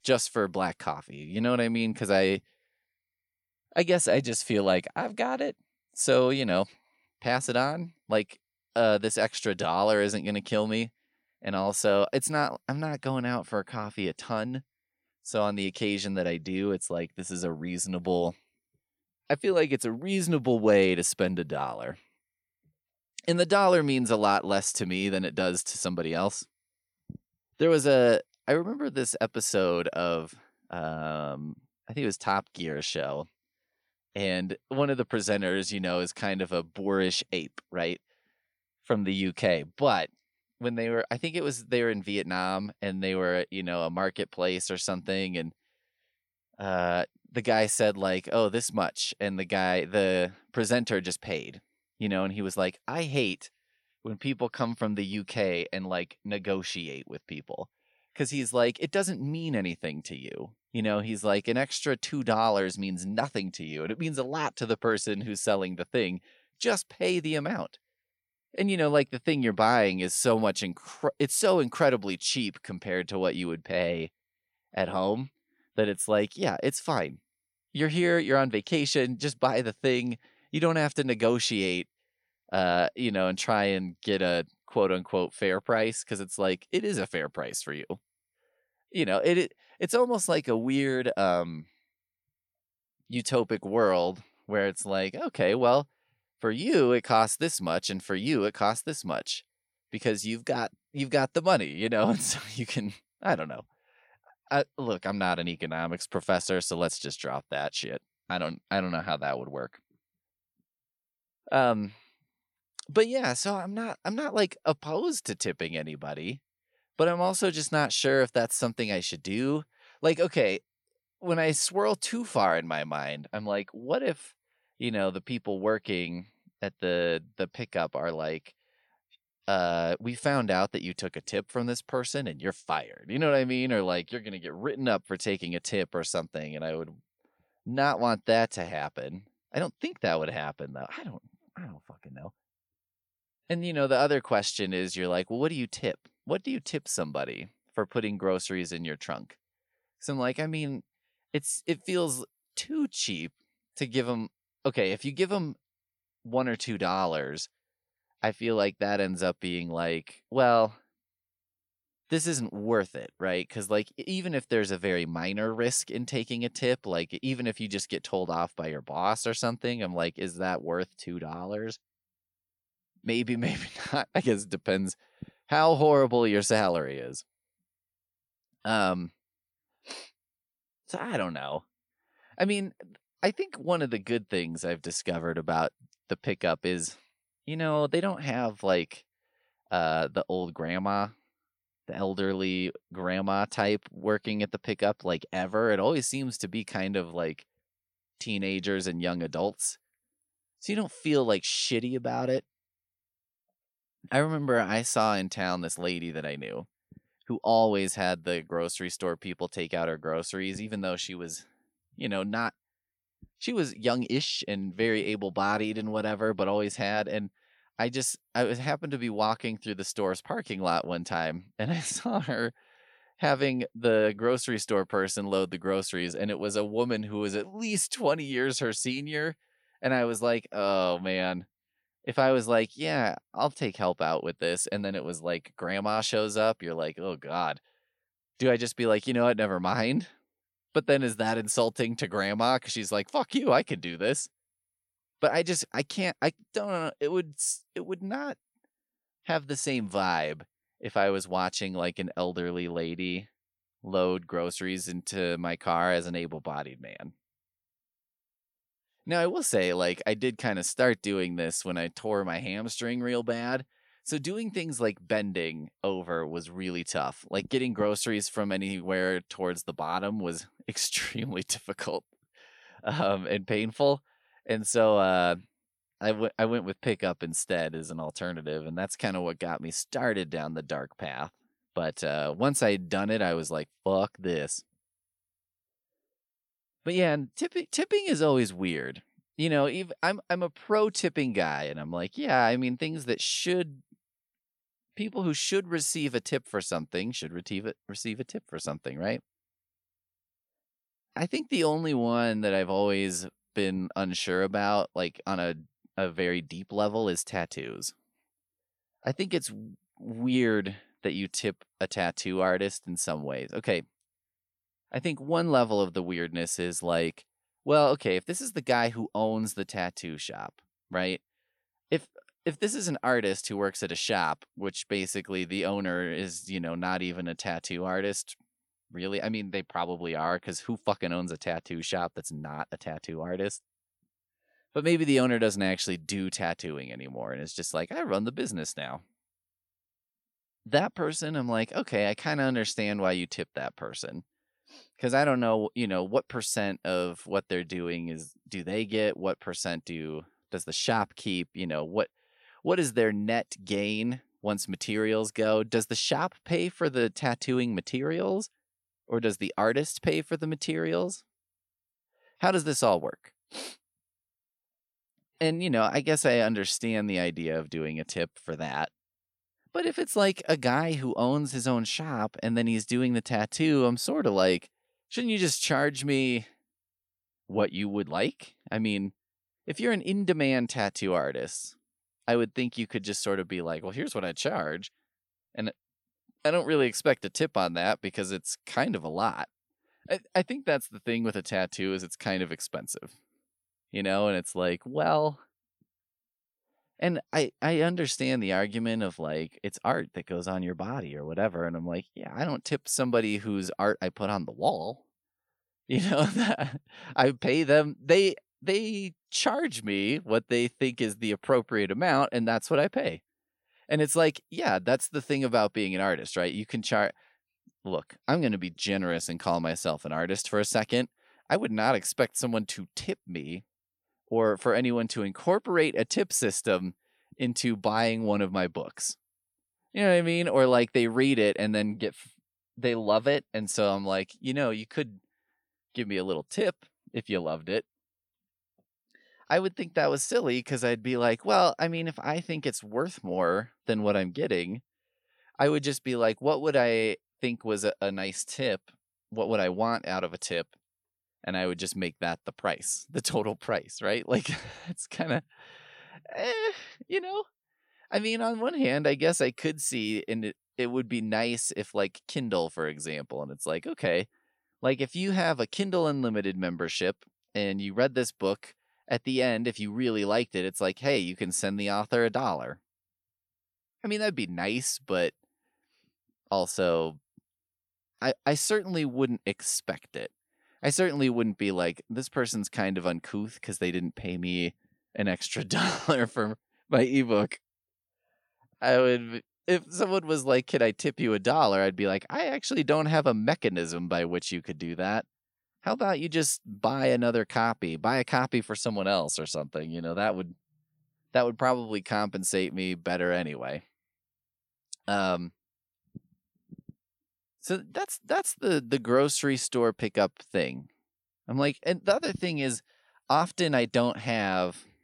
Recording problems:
none

